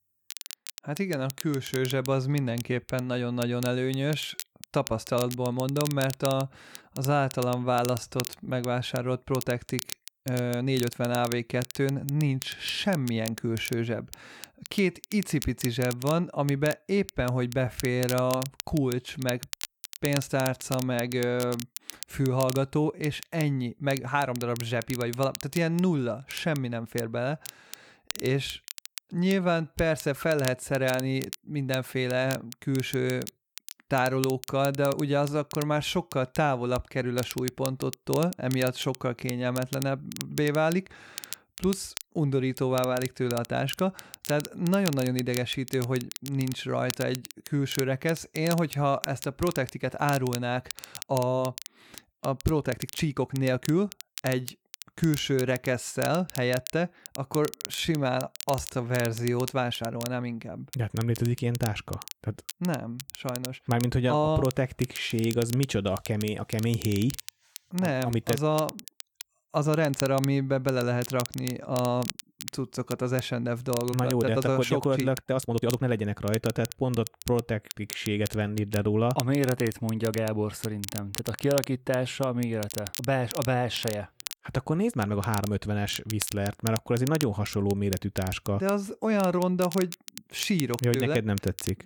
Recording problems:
crackle, like an old record; noticeable; 10 dB below the speech
uneven, jittery; strongly; from 3.5 s to 1:26

